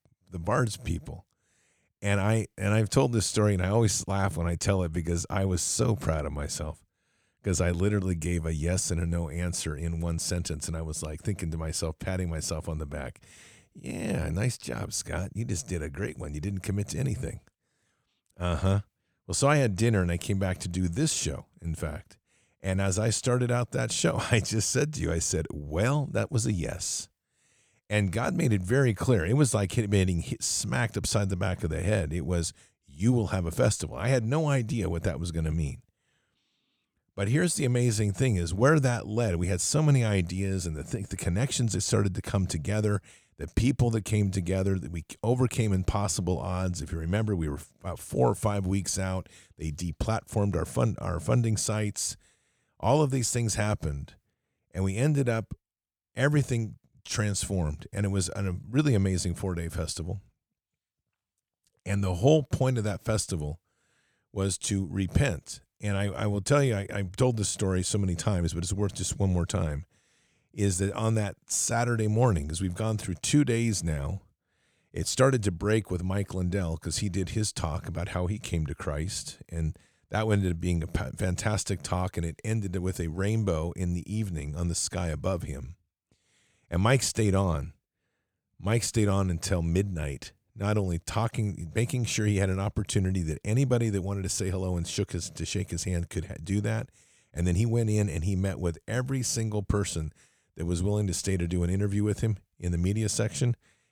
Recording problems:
none

